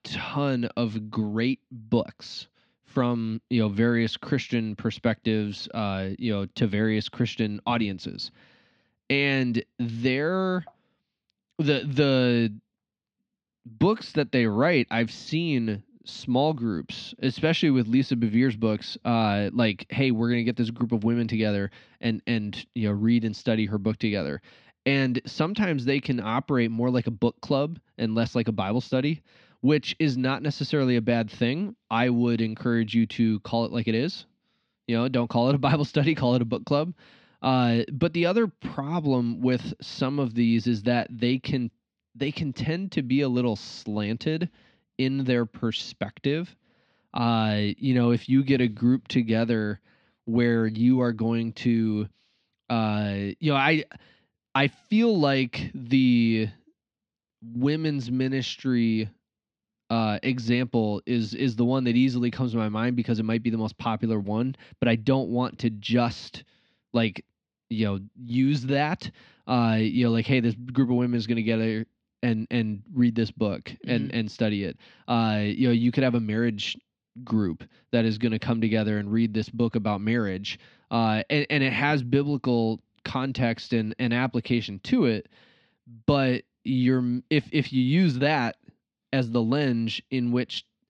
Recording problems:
muffled; very slightly; fading above 4 kHz

